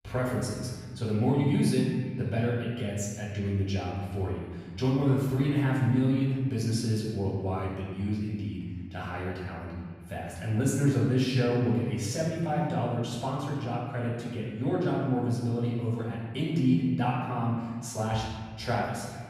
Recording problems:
off-mic speech; far
room echo; noticeable; dies away in 1.7 s
echo of what is said; faint; throughout; 250 ms later, 25 dB below the speech

